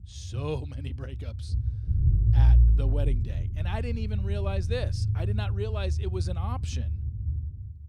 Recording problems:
low rumble; loud; throughout; 6 dB below the speech

